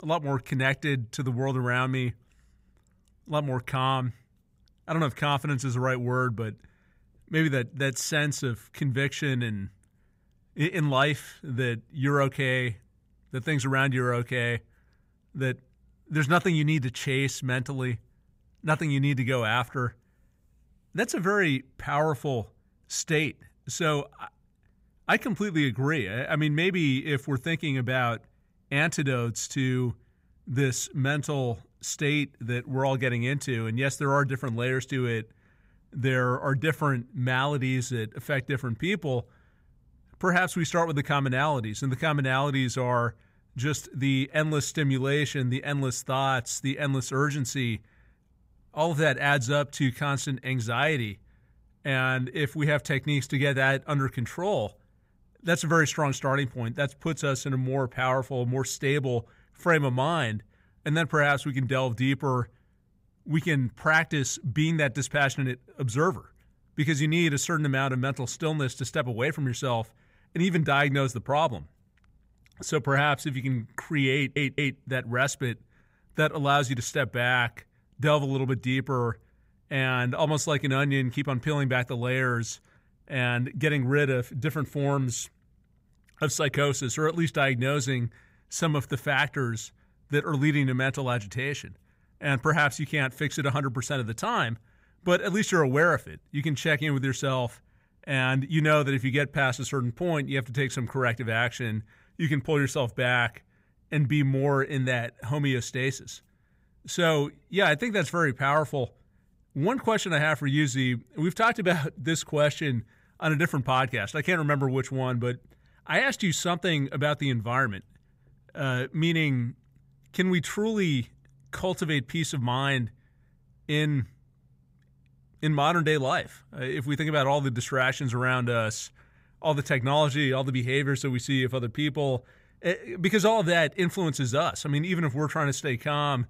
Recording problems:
audio stuttering; at 1:14

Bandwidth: 15.5 kHz